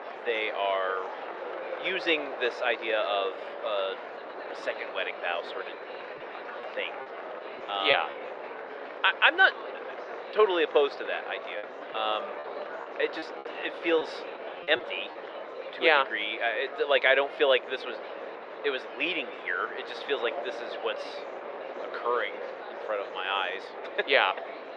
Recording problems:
muffled; very; fading above 2.5 kHz
thin; very; fading below 500 Hz
murmuring crowd; noticeable; throughout; 15 dB below the speech
wind noise on the microphone; occasional gusts; 15 dB below the speech
choppy; very; from 6.5 to 8 s and from 12 to 15 s; 6% of the speech affected

